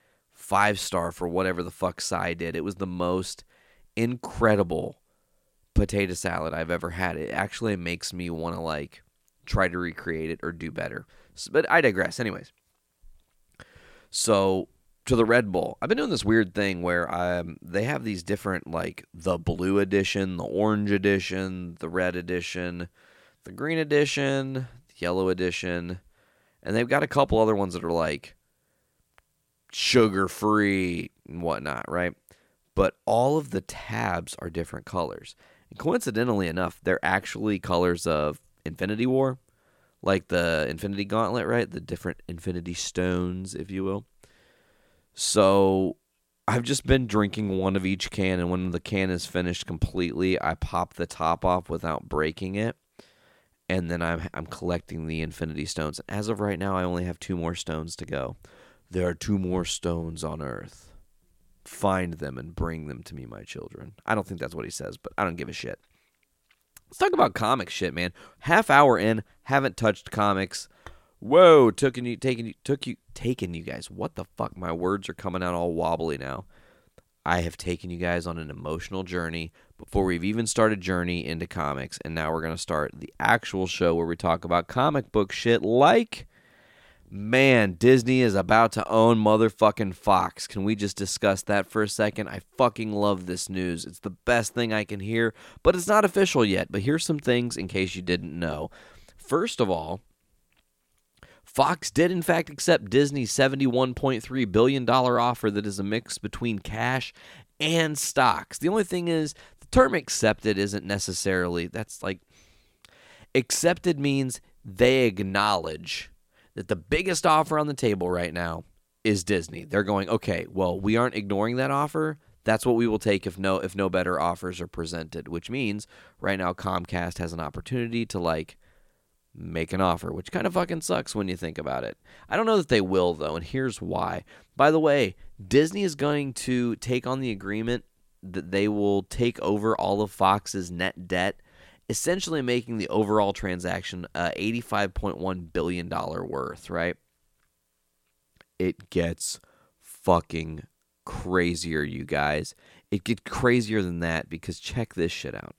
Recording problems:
none

